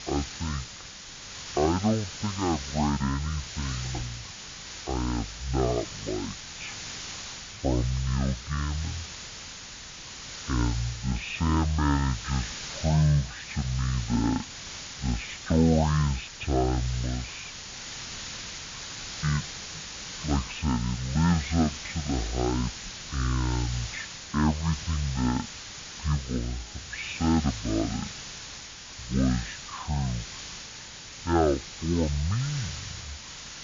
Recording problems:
high frequencies cut off; severe; nothing above 4 kHz
wrong speed and pitch; too slow and too low; 0.5 times normal speed
hiss; loud; throughout; 9 dB below the speech

